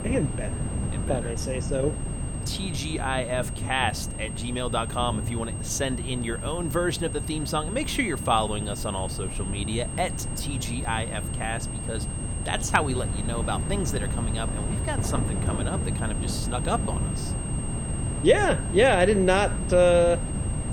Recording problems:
high-pitched whine; loud; throughout; 8.5 kHz, 9 dB below the speech
rain or running water; noticeable; throughout; 10 dB below the speech
wind noise on the microphone; occasional gusts; 15 dB below the speech

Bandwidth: 18 kHz